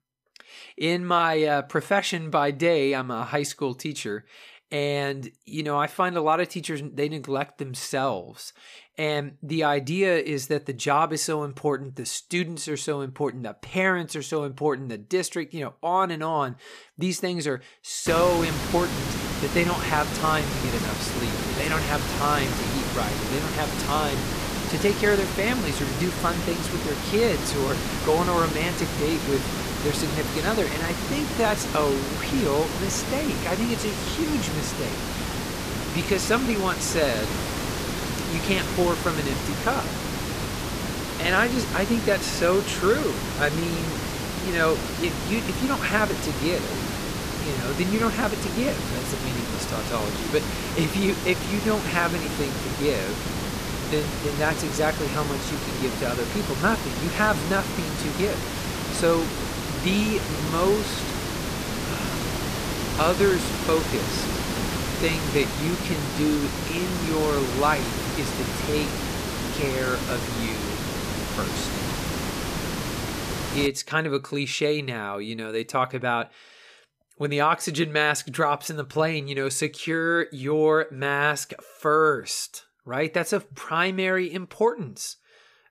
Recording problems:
hiss; loud; from 18 s to 1:14; 3 dB below the speech

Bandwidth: 14.5 kHz